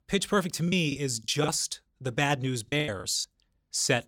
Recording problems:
choppy; very; at 0.5 s and at 2.5 s; 20% of the speech affected

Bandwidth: 17 kHz